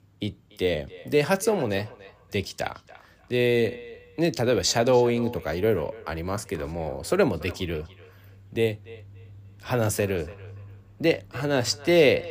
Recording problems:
echo of what is said; faint; throughout; 290 ms later, 20 dB below the speech

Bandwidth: 15 kHz